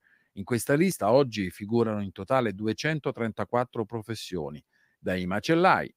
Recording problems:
none

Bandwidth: 15.5 kHz